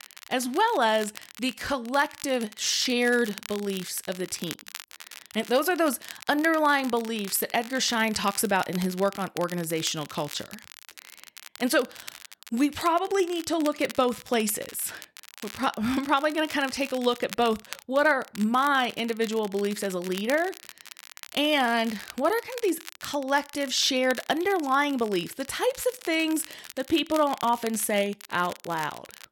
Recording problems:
crackle, like an old record; noticeable; 15 dB below the speech

